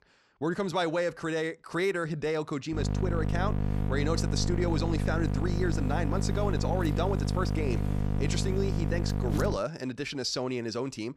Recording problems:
electrical hum; loud; from 2.5 to 9.5 s; 50 Hz, 6 dB below the speech

